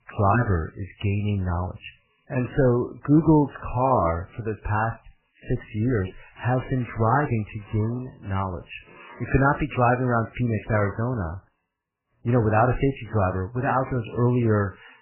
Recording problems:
garbled, watery; badly; nothing above 3 kHz
machinery noise; faint; throughout; 25 dB below the speech

